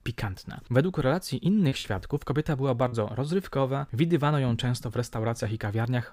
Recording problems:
choppy; very; from 1.5 to 3 s; 7% of the speech affected

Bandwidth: 15.5 kHz